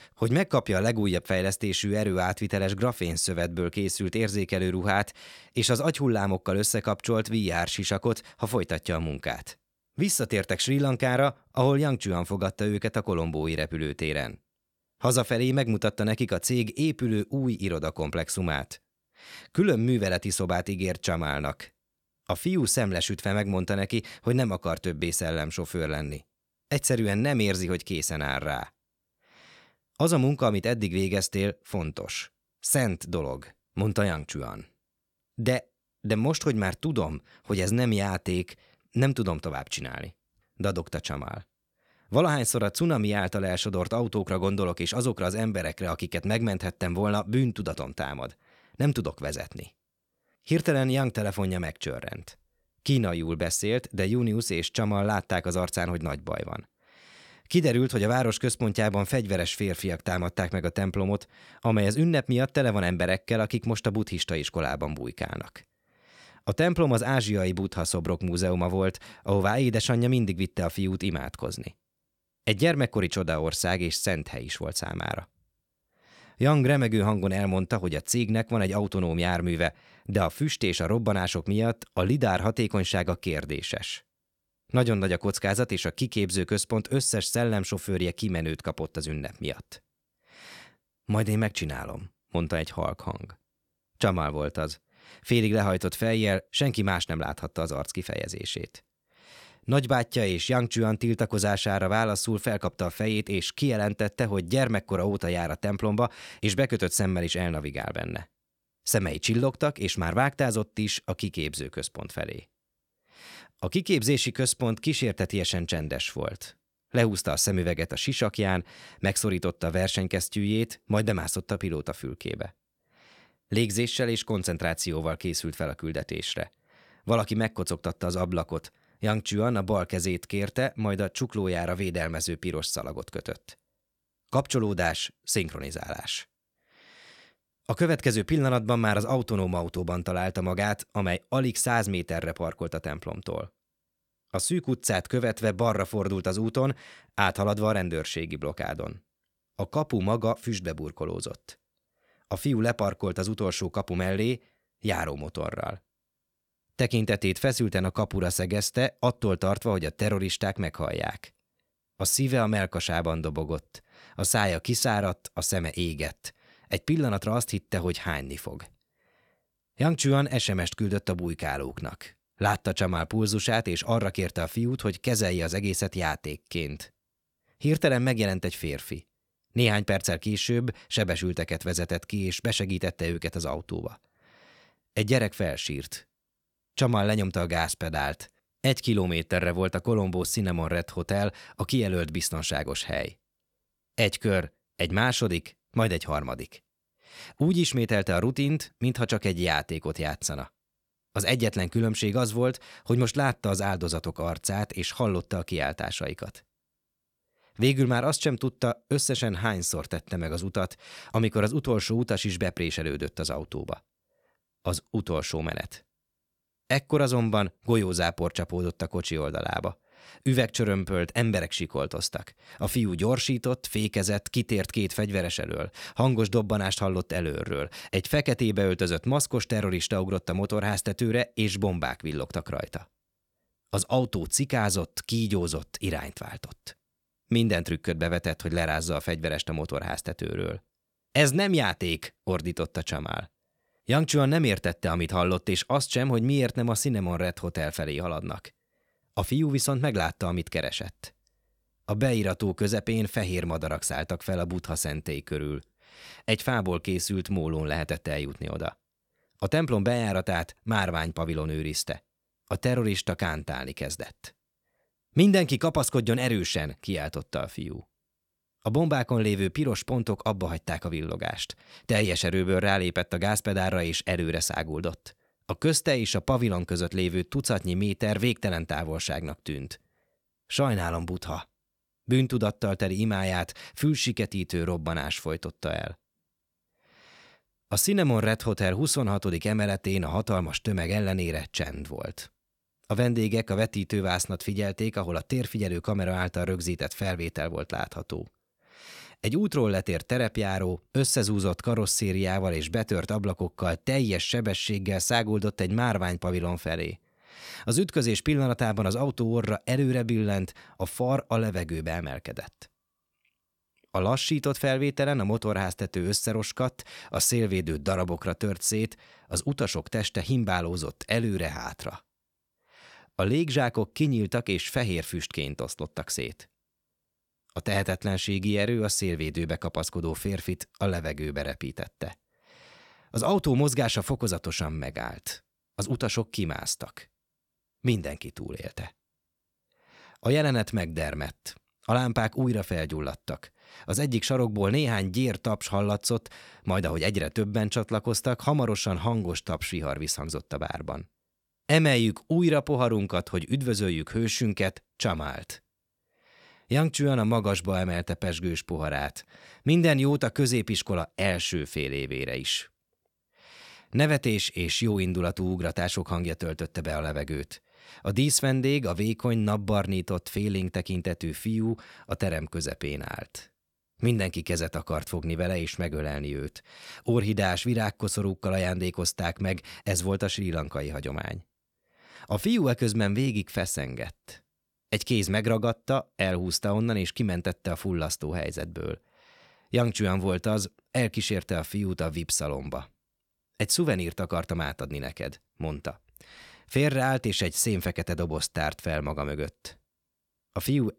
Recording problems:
none

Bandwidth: 17.5 kHz